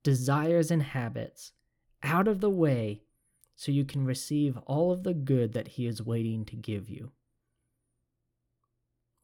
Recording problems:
none

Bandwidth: 18 kHz